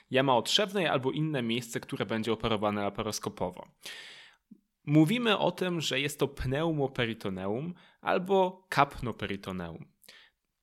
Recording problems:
none

